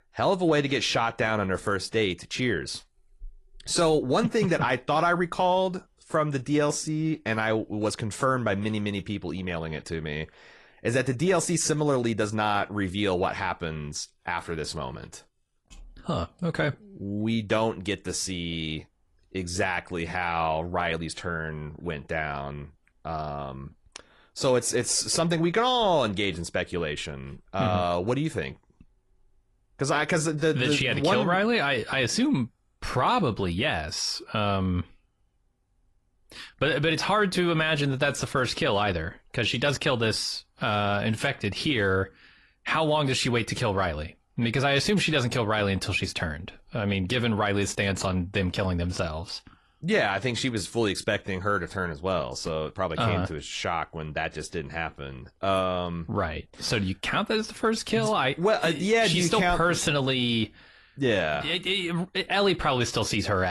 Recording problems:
garbled, watery; slightly; nothing above 11 kHz
abrupt cut into speech; at the end

